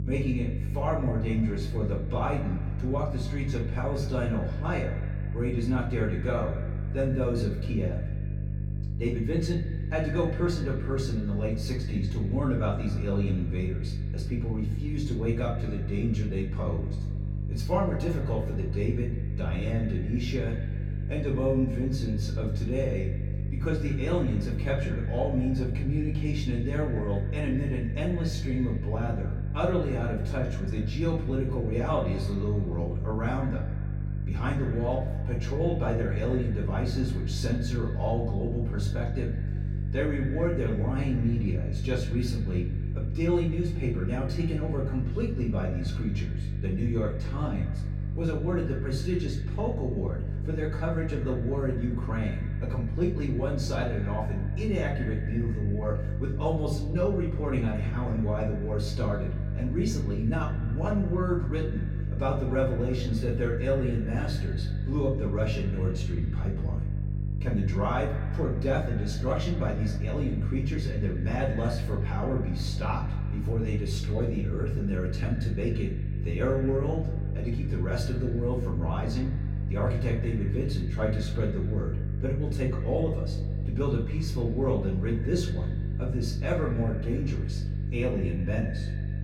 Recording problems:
off-mic speech; far
echo of what is said; noticeable; throughout; 110 ms later, 15 dB below the speech
room echo; slight; dies away in 0.4 s
electrical hum; noticeable; throughout; 50 Hz, 10 dB below the speech

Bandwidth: 17.5 kHz